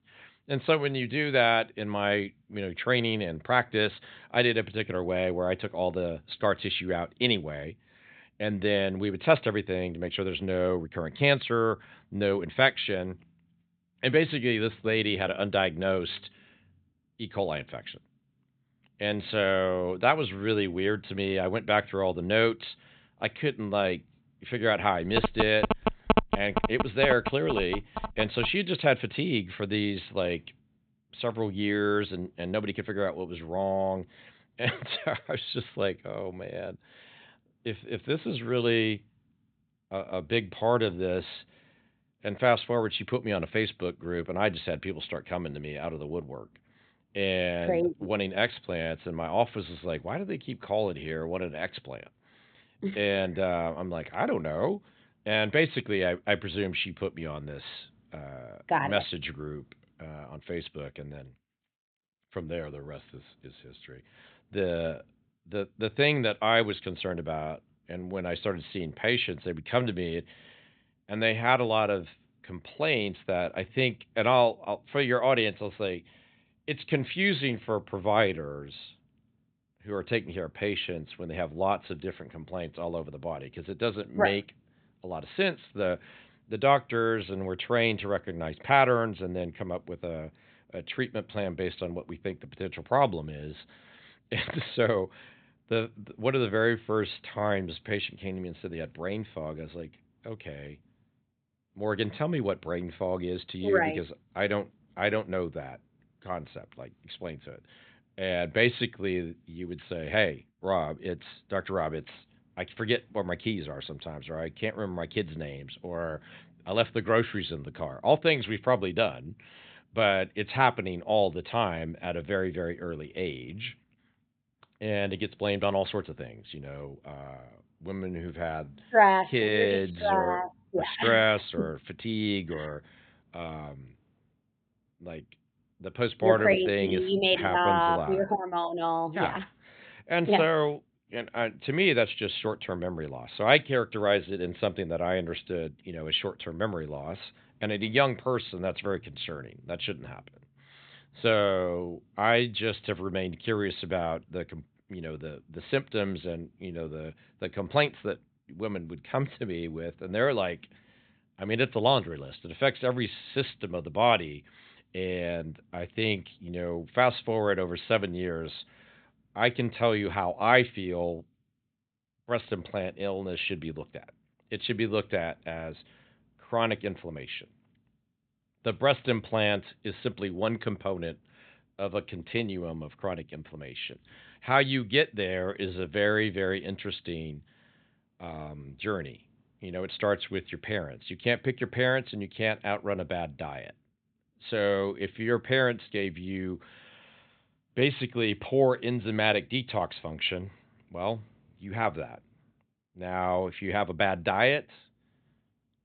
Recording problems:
high frequencies cut off; severe; nothing above 4 kHz
phone ringing; loud; from 25 to 28 s; peak 3 dB above the speech

